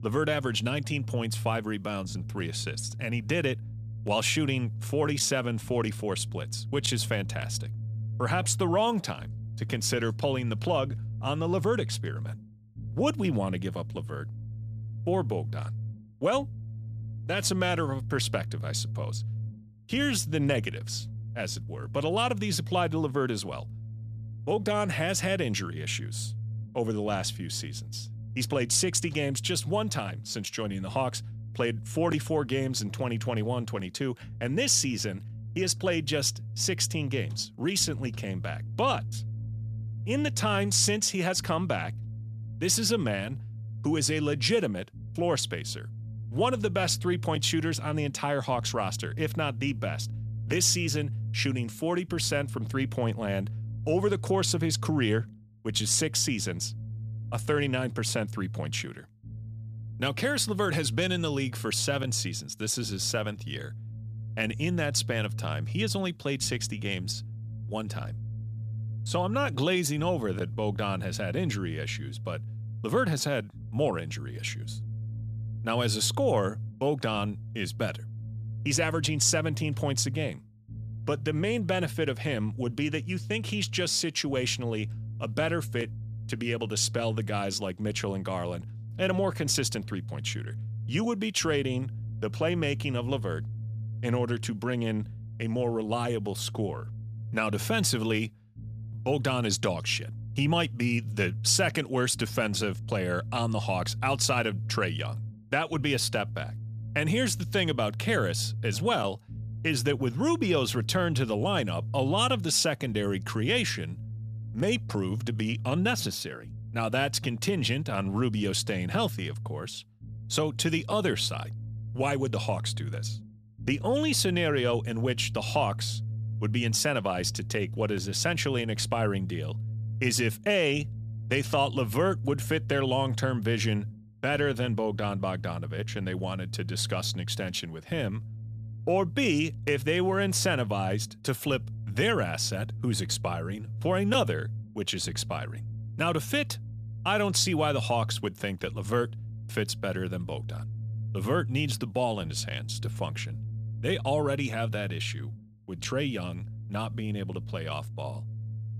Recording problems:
low rumble; faint; throughout; 20 dB below the speech

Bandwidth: 14.5 kHz